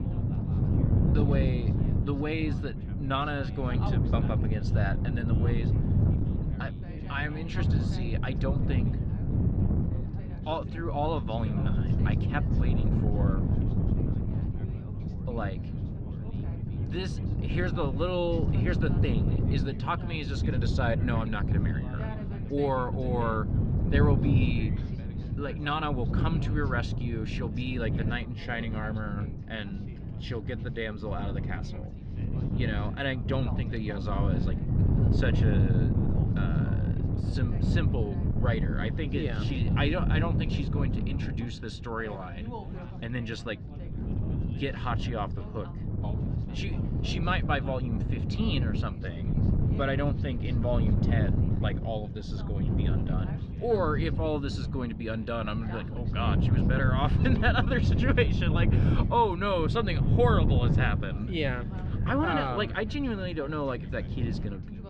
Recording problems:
muffled; slightly; fading above 4 kHz
wind noise on the microphone; heavy; 6 dB below the speech
background chatter; noticeable; throughout; 3 voices, 15 dB below the speech

